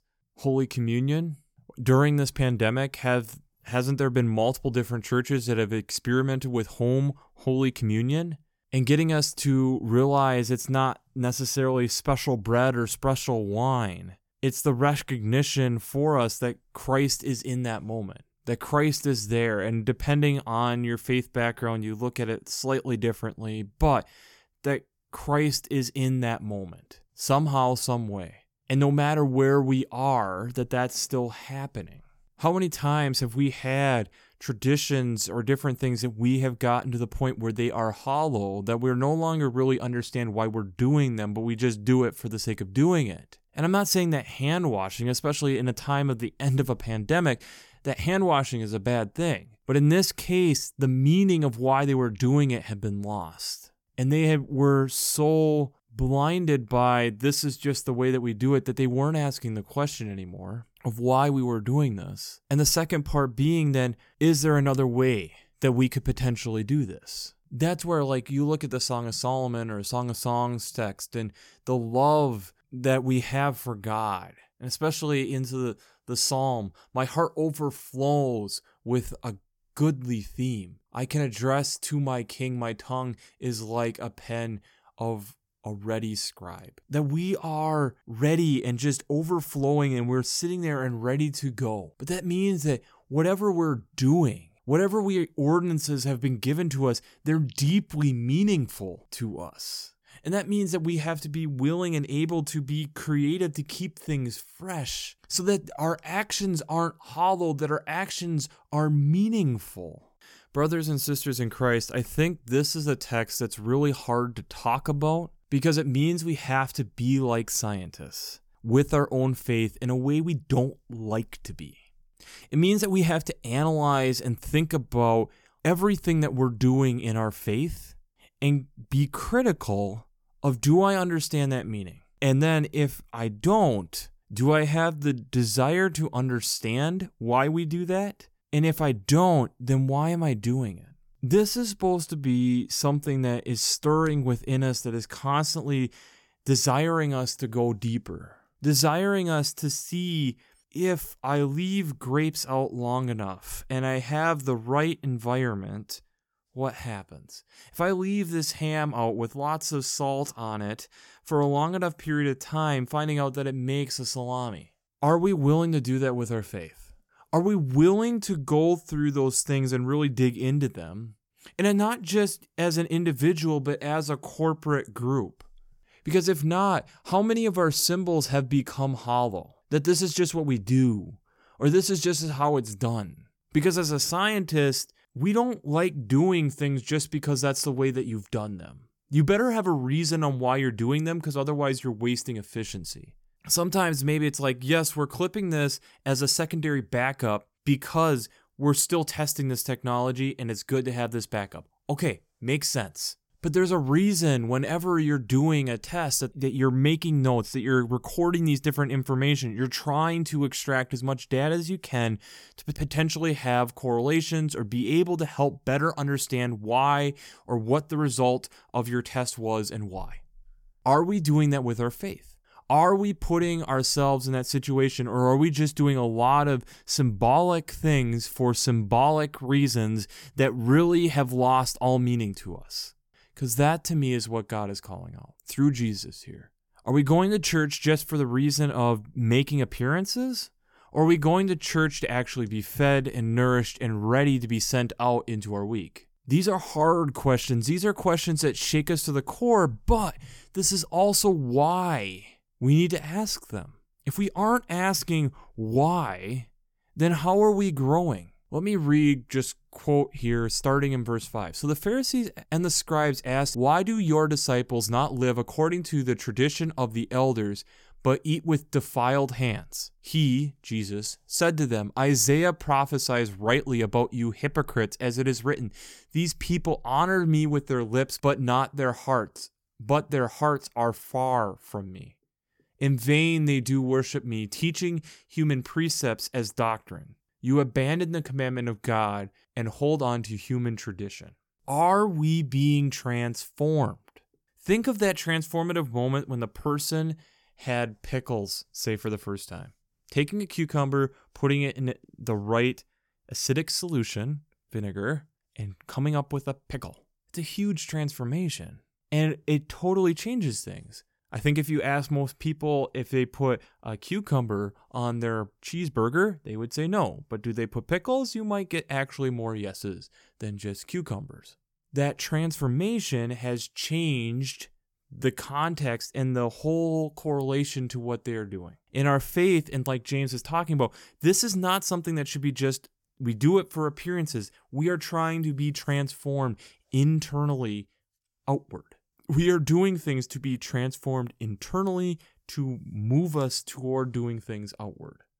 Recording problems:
none

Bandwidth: 17.5 kHz